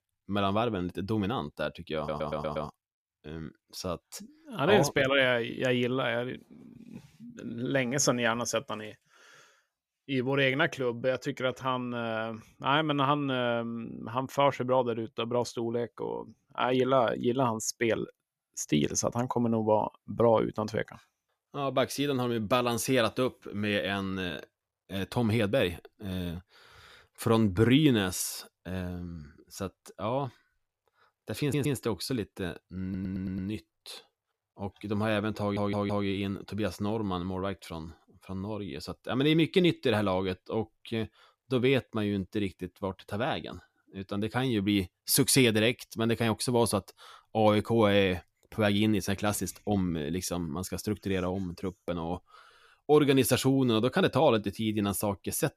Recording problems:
audio stuttering; 4 times, first at 2 s

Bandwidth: 14.5 kHz